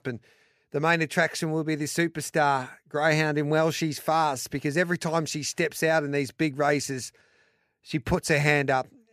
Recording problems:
none

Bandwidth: 14.5 kHz